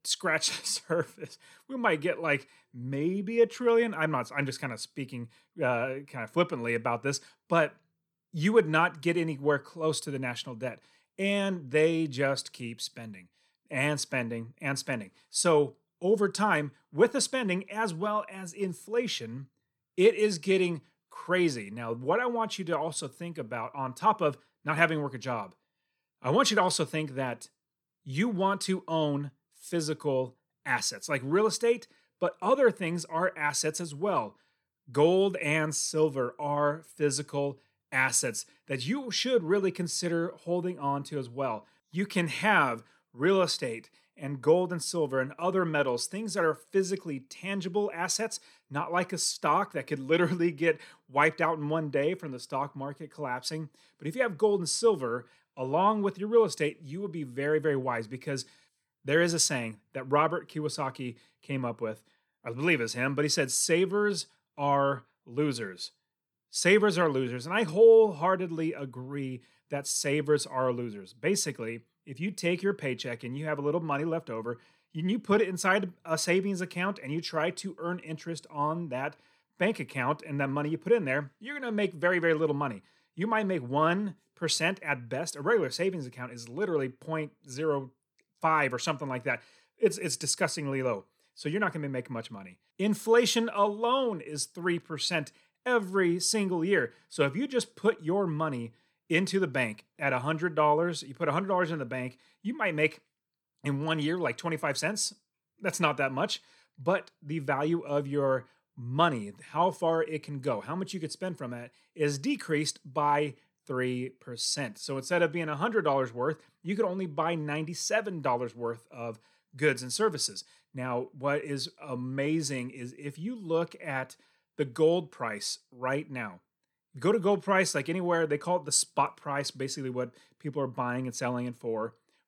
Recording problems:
none

